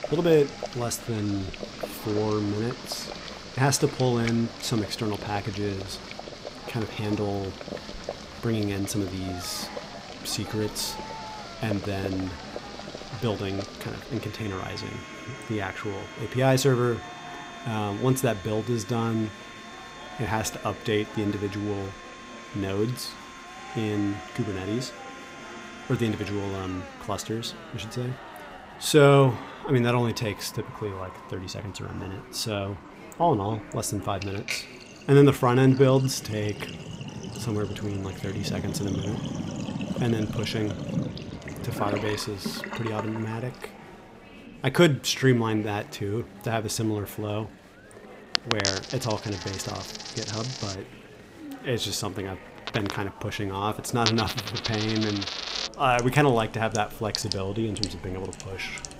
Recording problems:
household noises; loud; throughout; 9 dB below the speech
murmuring crowd; noticeable; throughout; 20 dB below the speech

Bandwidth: 15.5 kHz